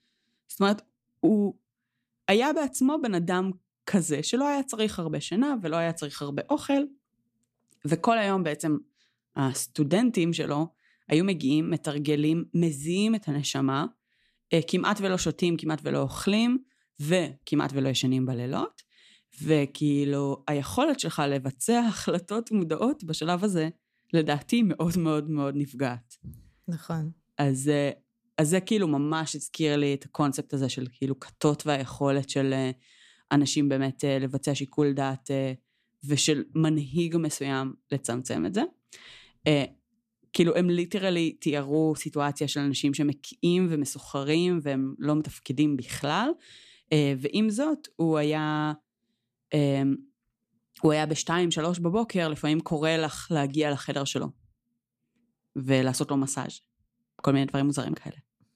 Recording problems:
none

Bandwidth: 14.5 kHz